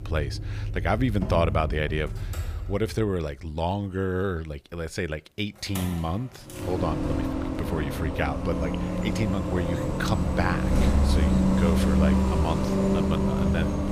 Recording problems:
traffic noise; very loud; throughout; 3 dB above the speech

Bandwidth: 15 kHz